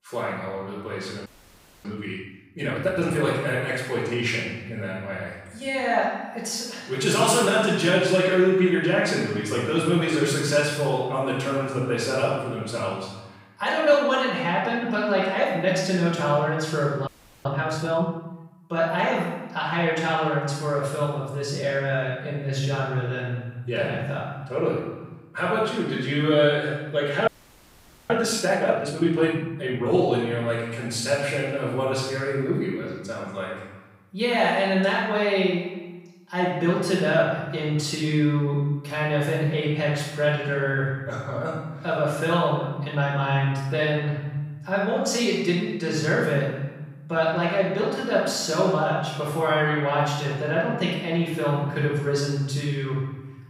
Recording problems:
room echo; strong; dies away in 1.1 s
off-mic speech; far
audio freezing; at 1.5 s for 0.5 s, at 17 s and at 27 s for 1 s

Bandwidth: 15.5 kHz